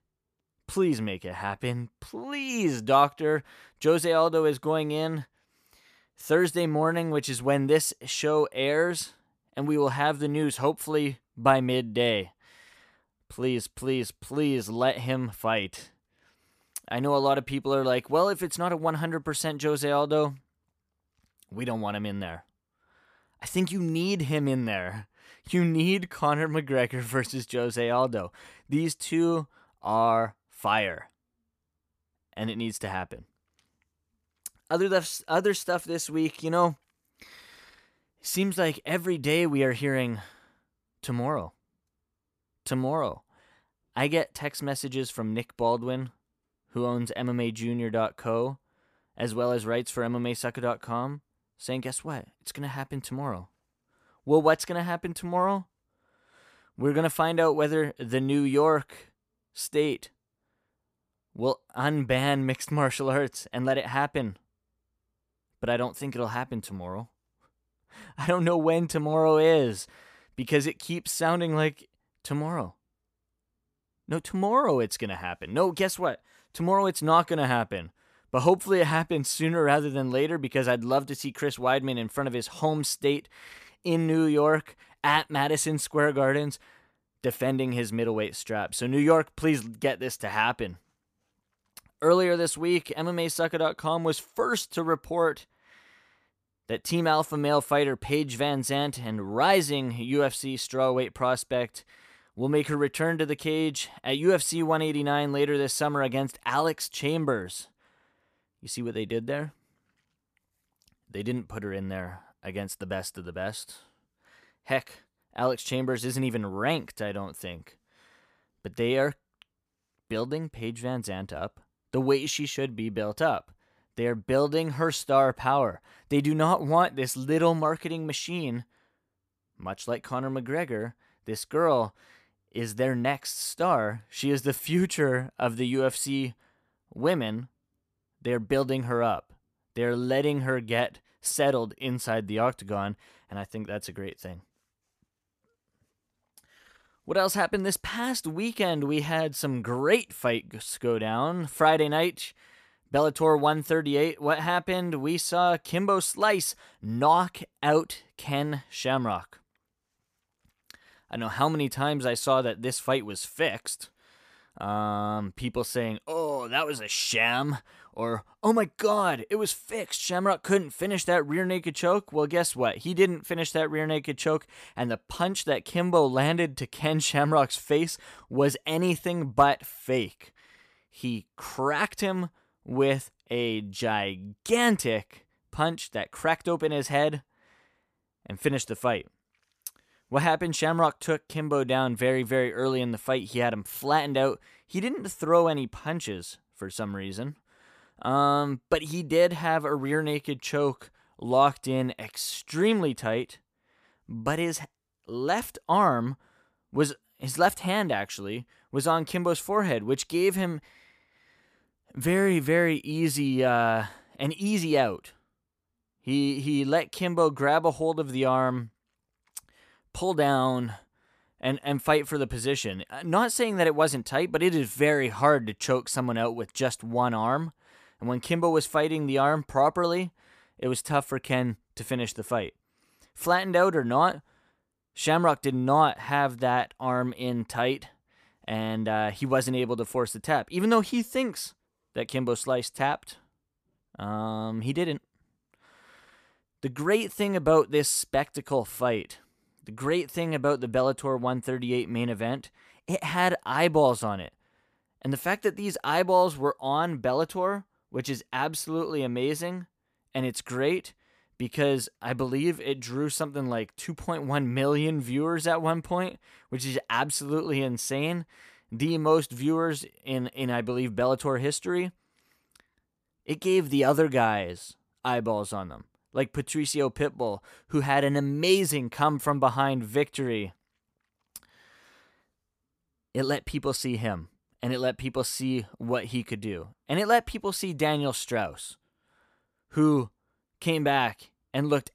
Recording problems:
none

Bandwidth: 14.5 kHz